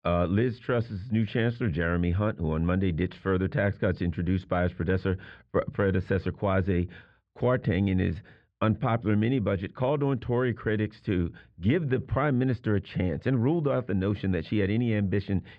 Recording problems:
muffled; slightly; fading above 2.5 kHz

